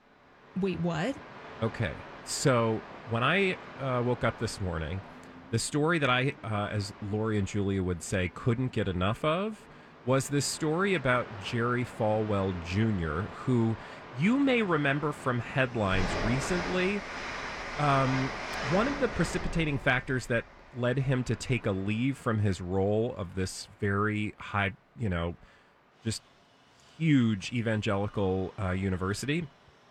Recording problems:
train or aircraft noise; noticeable; throughout; 10 dB below the speech

